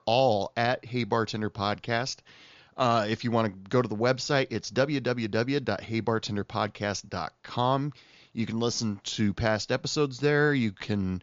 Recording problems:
high frequencies cut off; noticeable; nothing above 7 kHz

